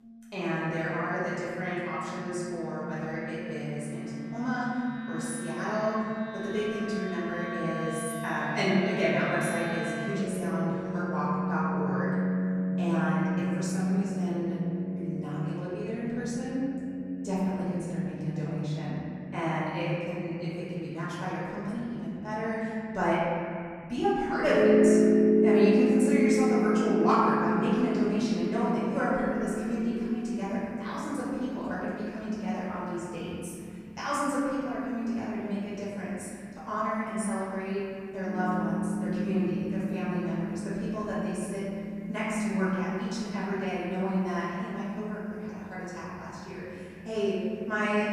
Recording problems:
room echo; strong; dies away in 2.9 s
off-mic speech; far
background music; very loud; throughout; as loud as the speech

